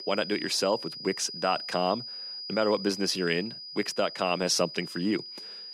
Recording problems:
high-pitched whine; loud; throughout; 5 kHz, 9 dB below the speech

